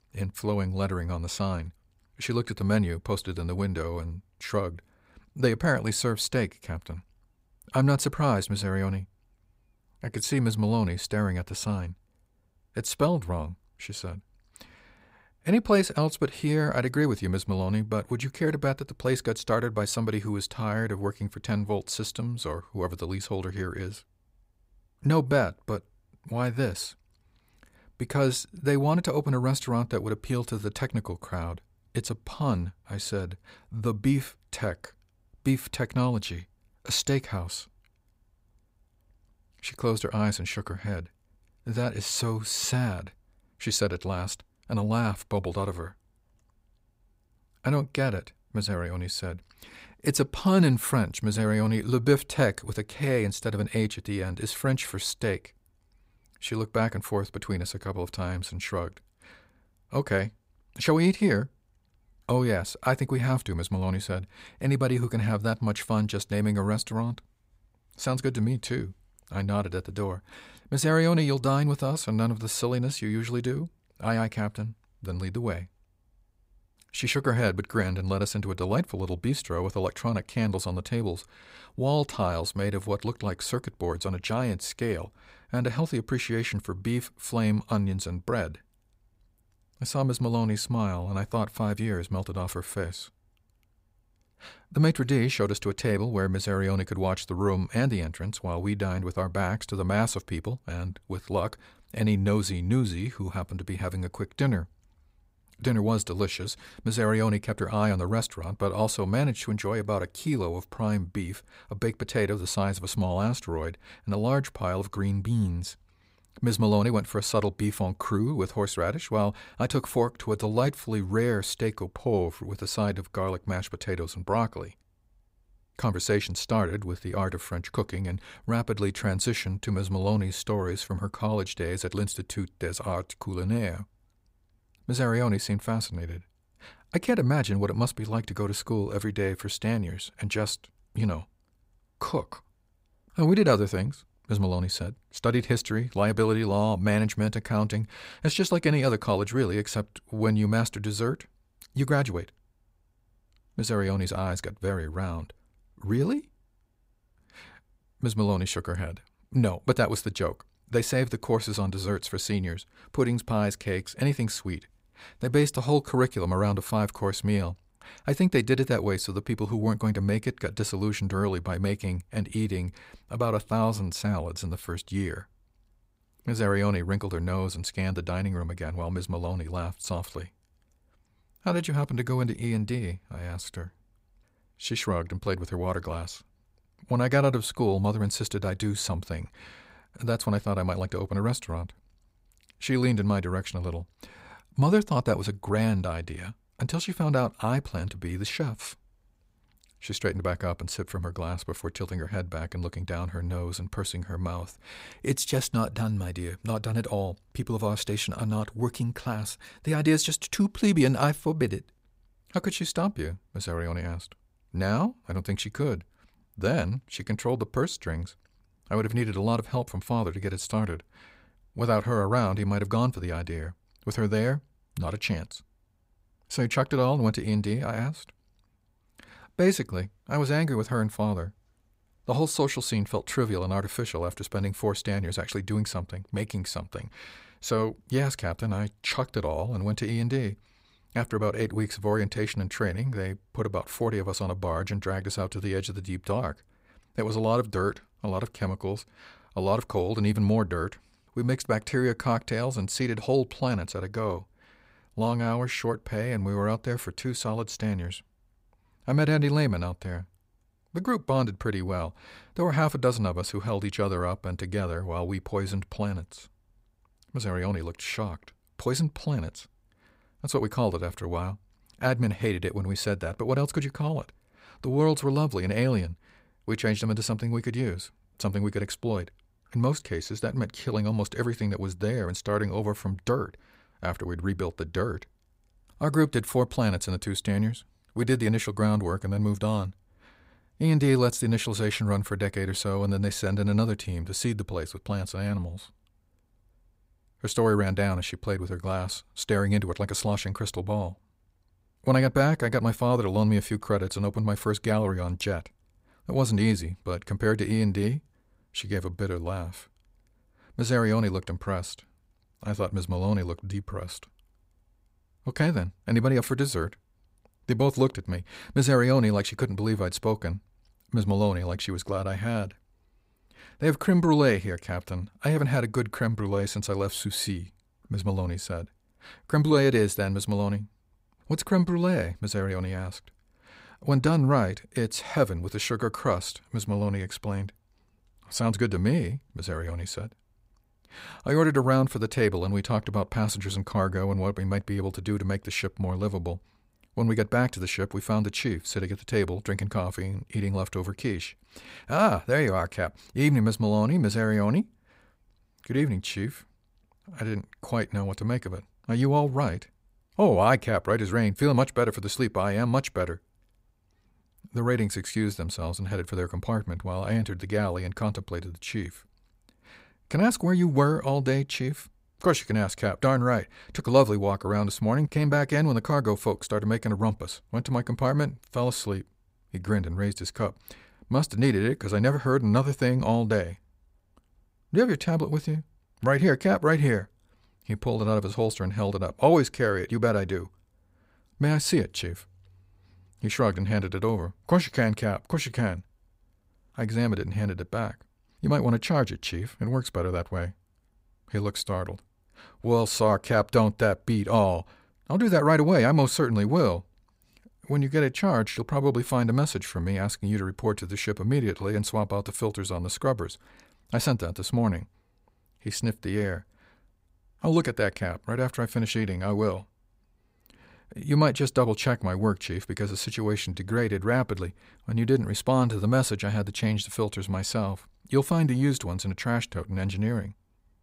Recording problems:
none

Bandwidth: 15.5 kHz